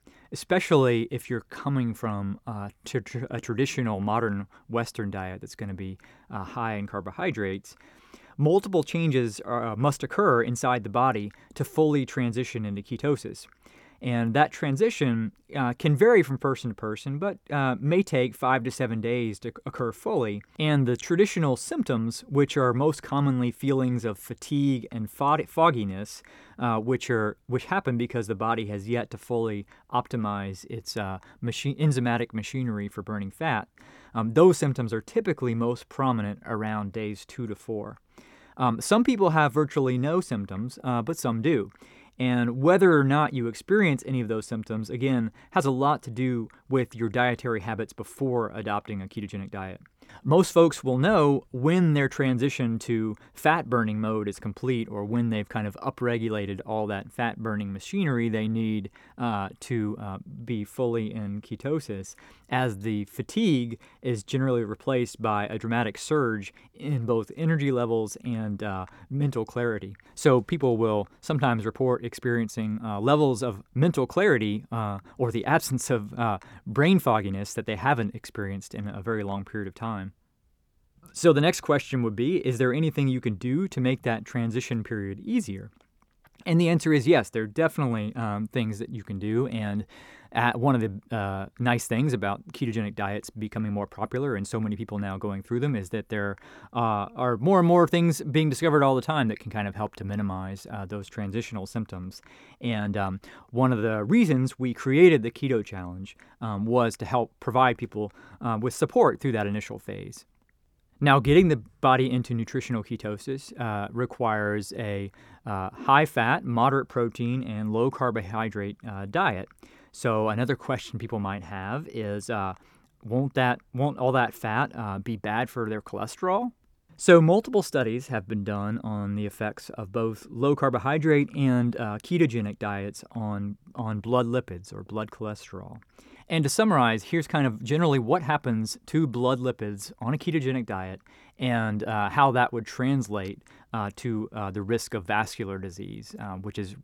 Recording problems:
none

